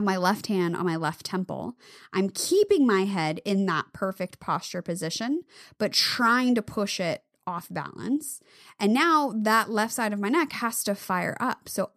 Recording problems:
abrupt cut into speech; at the start

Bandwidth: 14 kHz